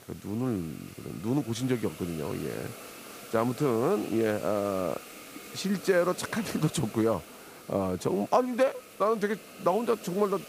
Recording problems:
hiss; noticeable; throughout; 15 dB below the speech

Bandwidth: 15 kHz